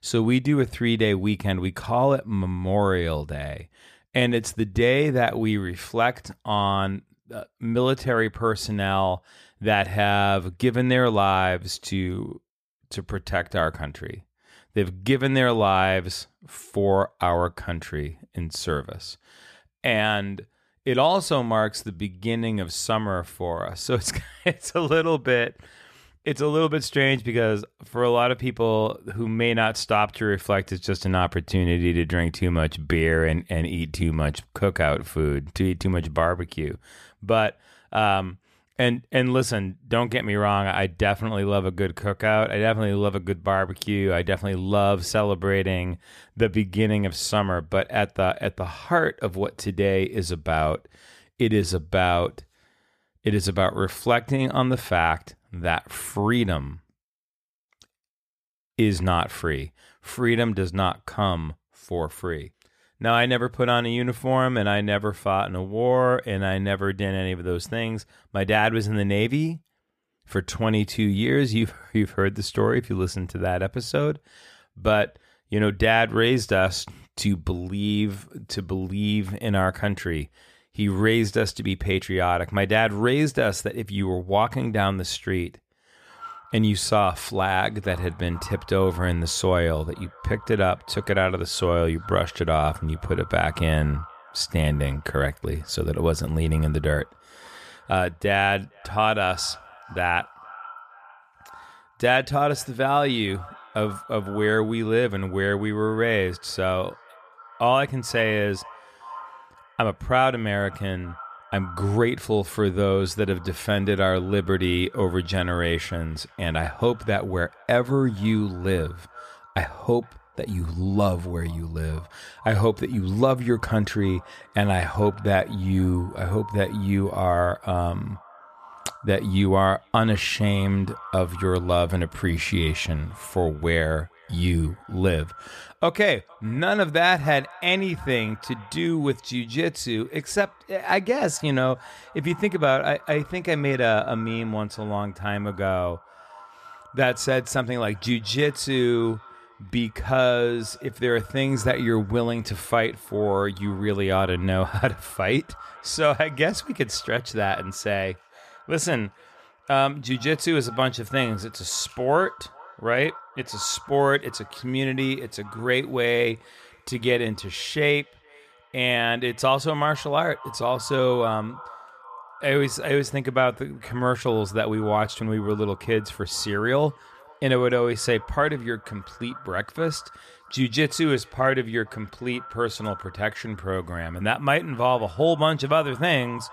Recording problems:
echo of what is said; faint; from 1:26 on; 460 ms later, 20 dB below the speech

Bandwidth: 15 kHz